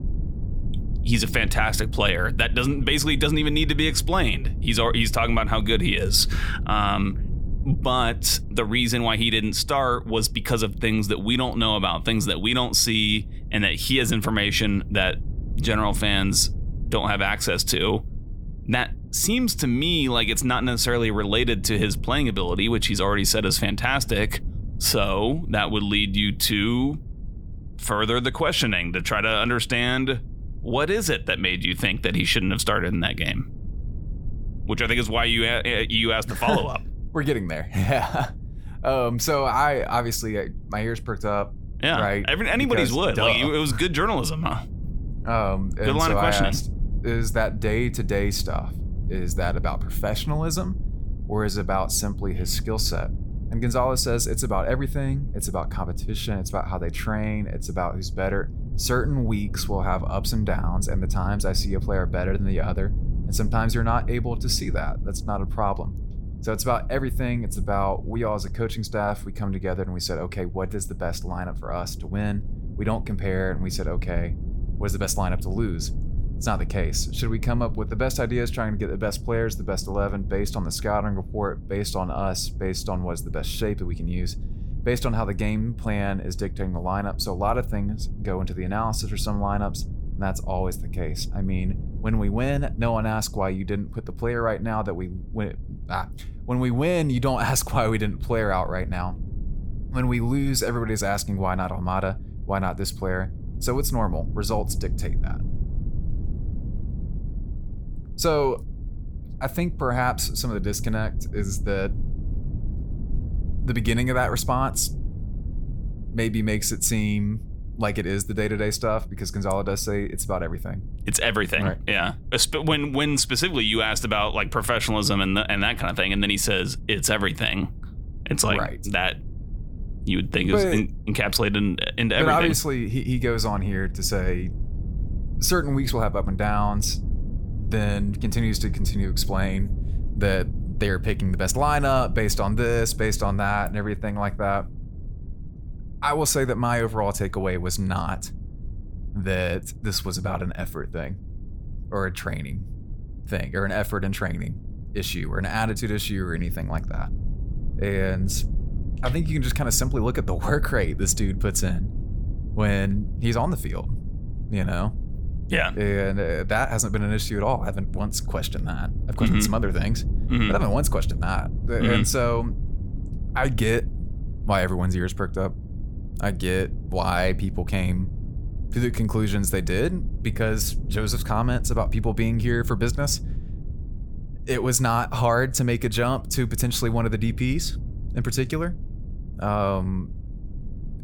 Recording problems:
low rumble; faint; throughout; 20 dB below the speech

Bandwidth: 18 kHz